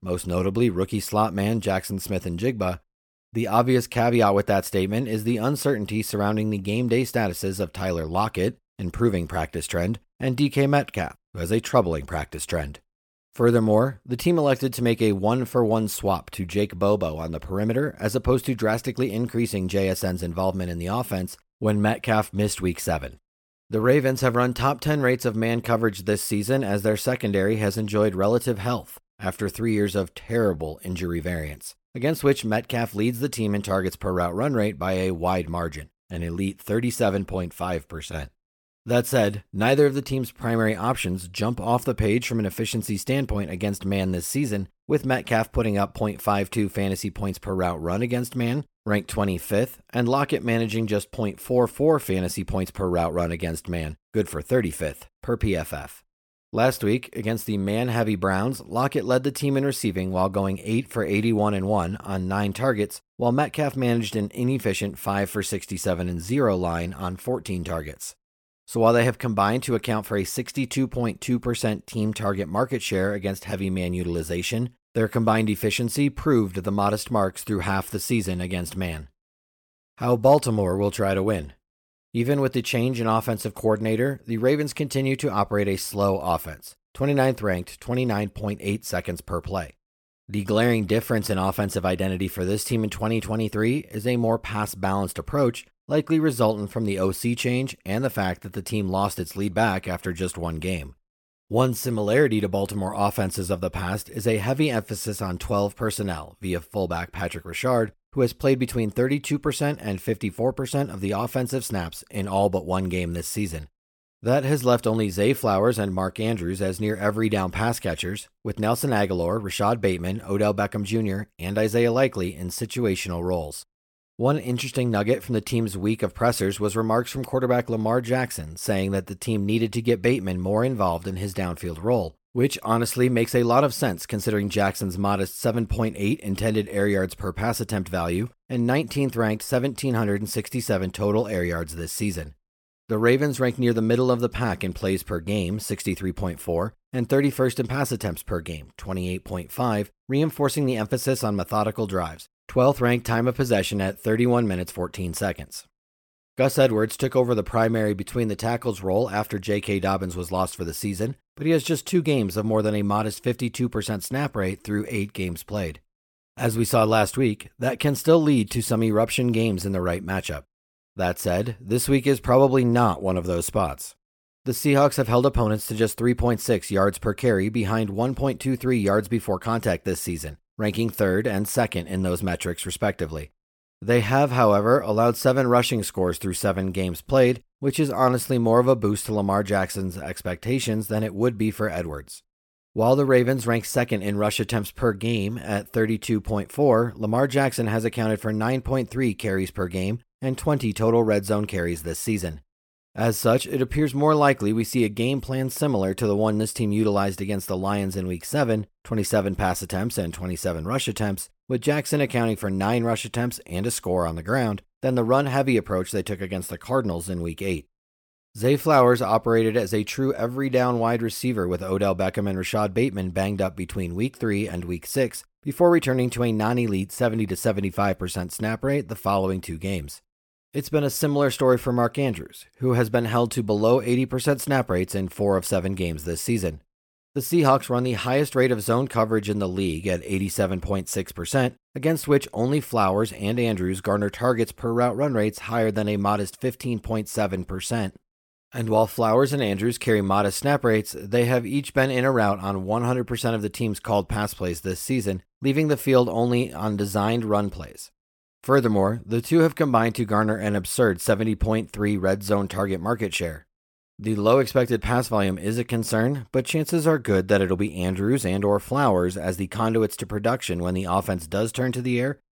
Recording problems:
none

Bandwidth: 17.5 kHz